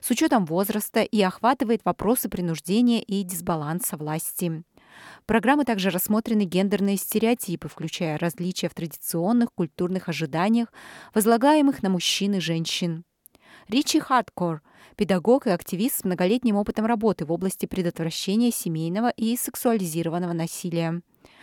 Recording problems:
none

